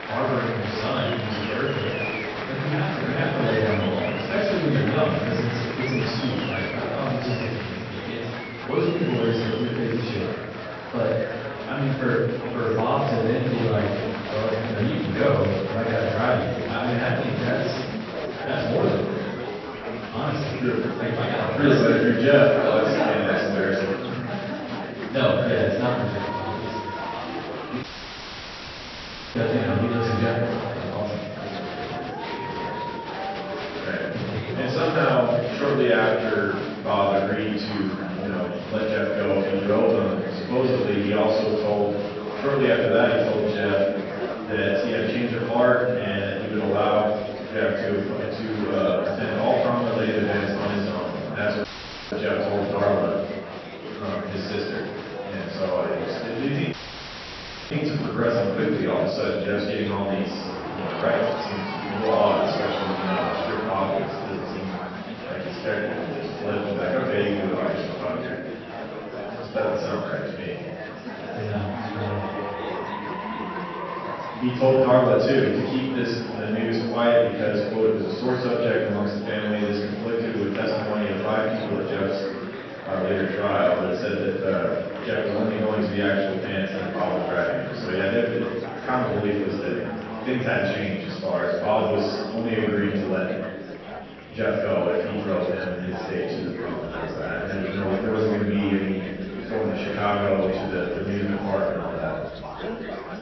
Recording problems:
room echo; strong; dies away in 1.1 s
off-mic speech; far
high frequencies cut off; noticeable; nothing above 6 kHz
murmuring crowd; loud; throughout; 8 dB below the speech
audio cutting out; at 28 s for 1.5 s, at 52 s and at 57 s for 1 s

